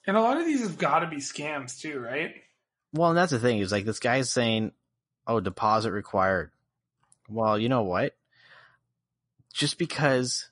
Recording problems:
garbled, watery; slightly; nothing above 10.5 kHz

